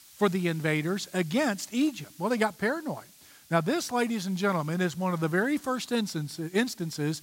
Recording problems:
hiss; faint; throughout; 25 dB below the speech

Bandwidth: 16 kHz